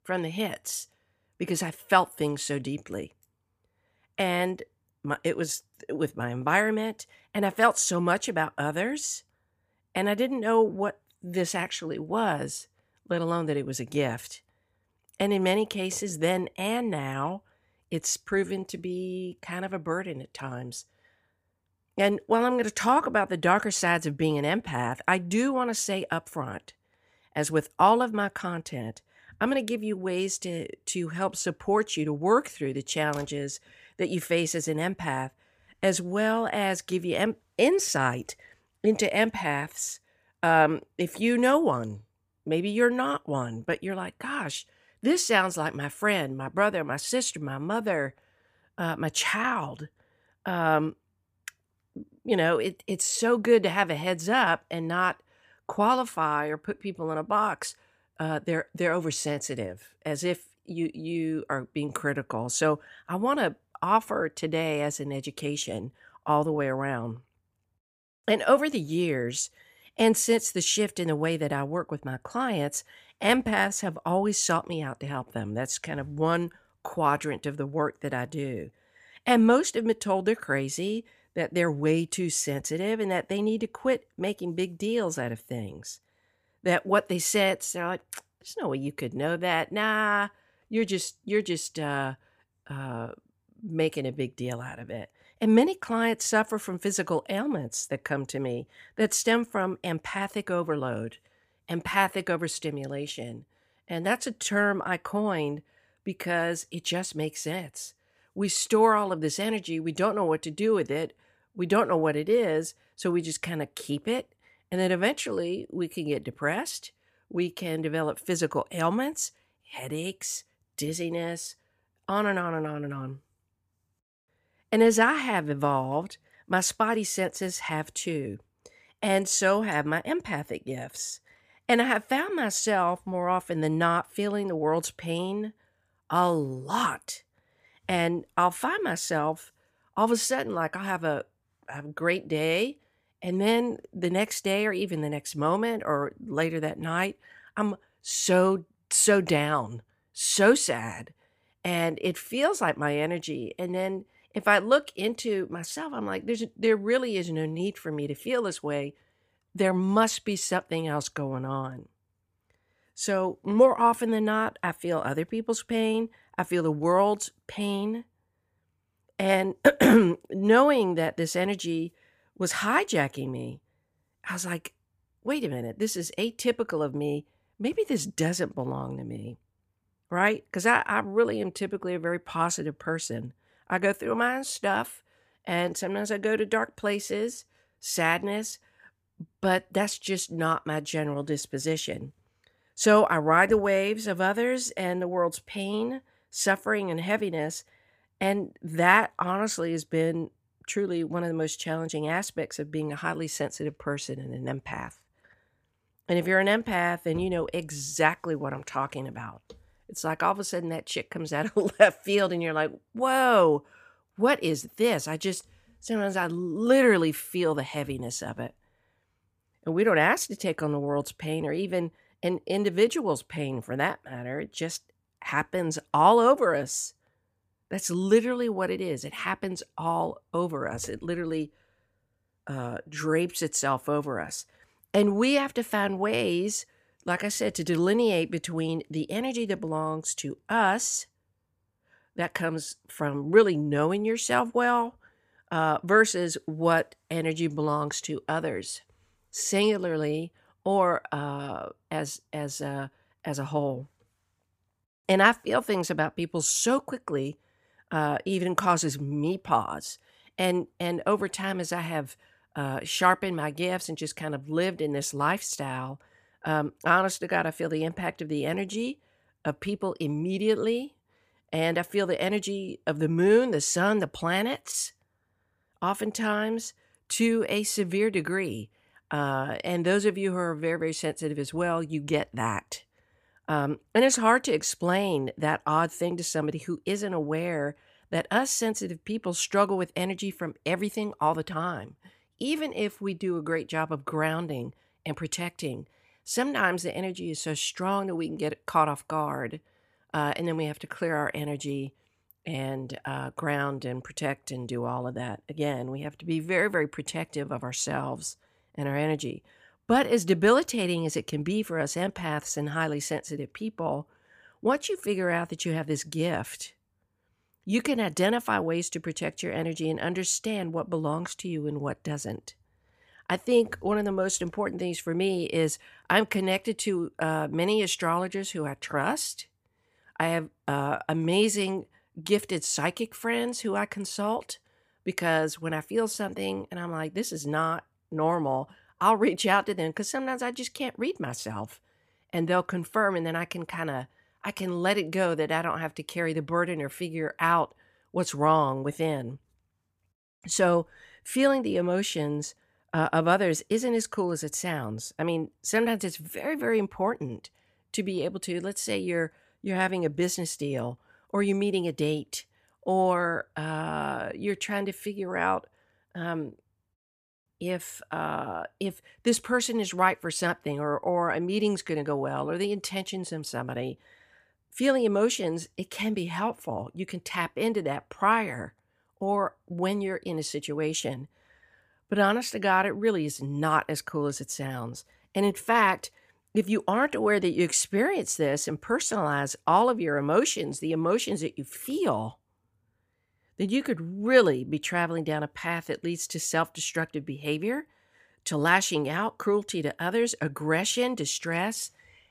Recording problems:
none

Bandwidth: 15 kHz